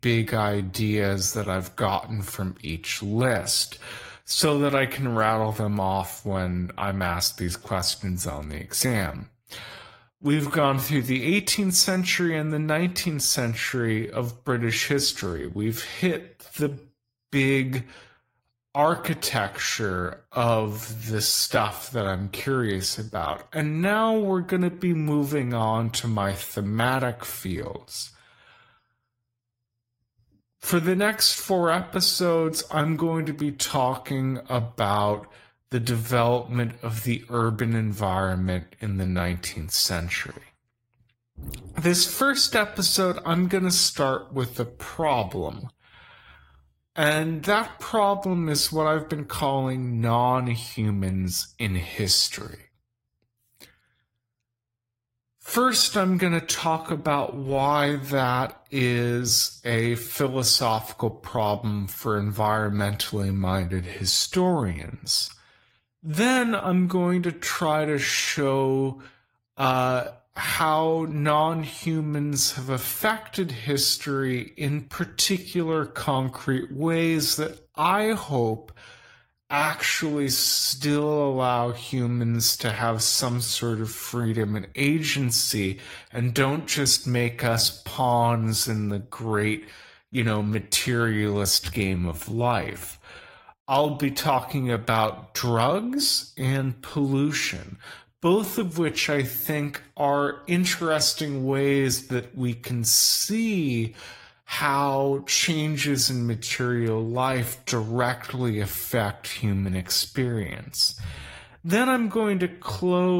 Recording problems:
wrong speed, natural pitch; too slow; 0.7 times normal speed
garbled, watery; slightly; nothing above 15.5 kHz
abrupt cut into speech; at the end

